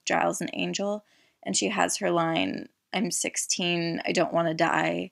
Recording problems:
none

